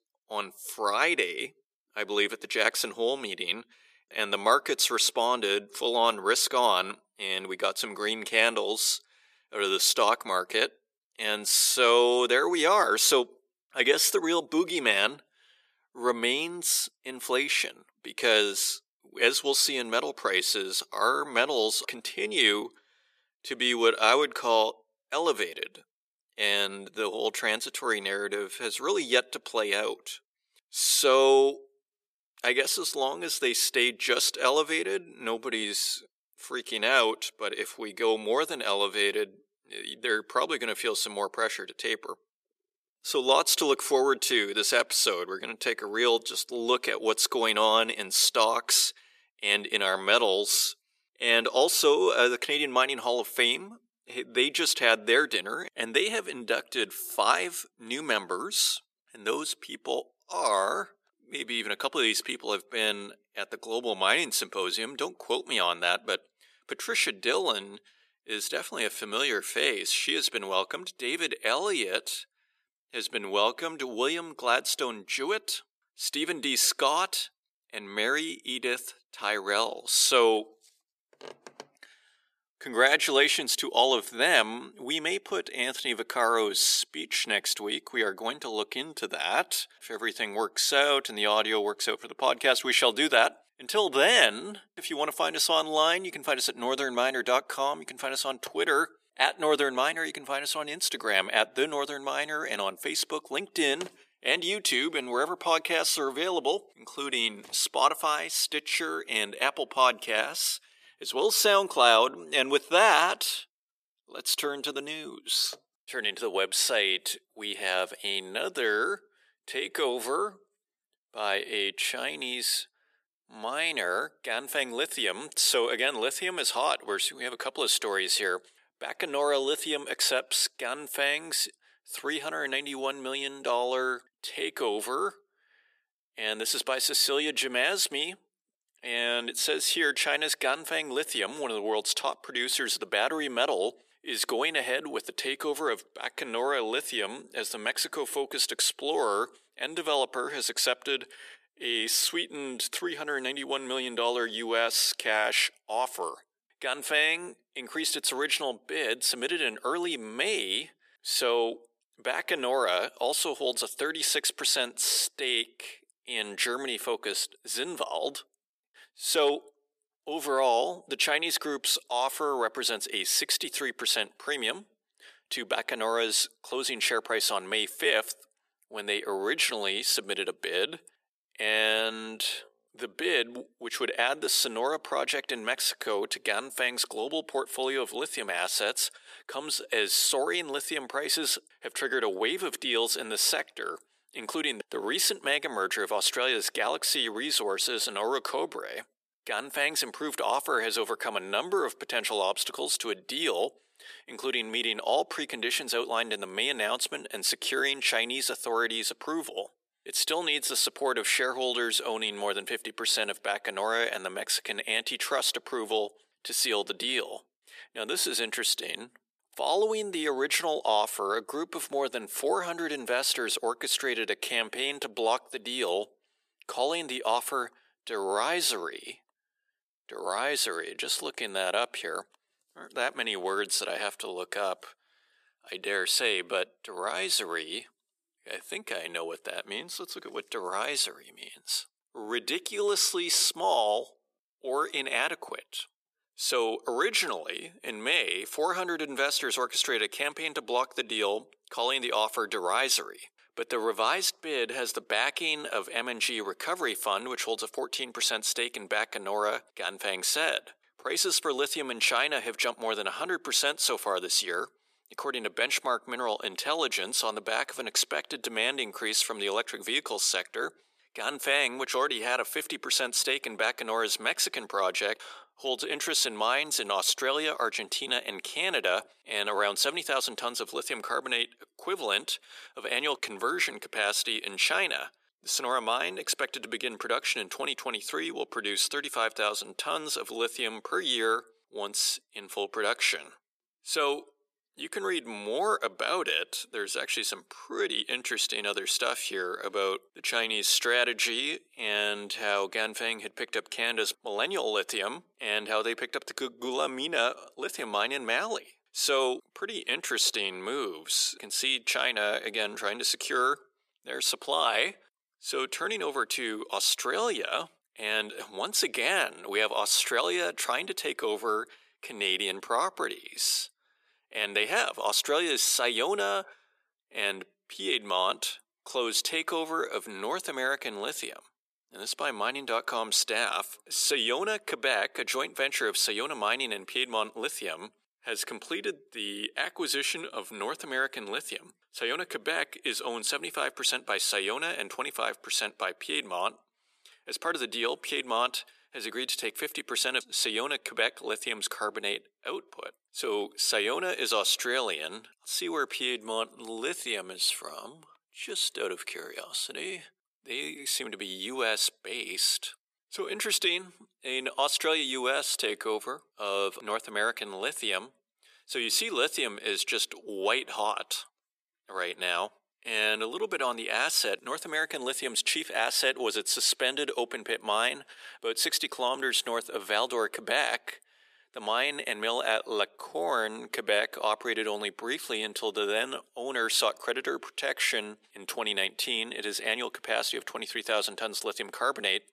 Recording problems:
thin; very; fading below 400 Hz

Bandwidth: 14.5 kHz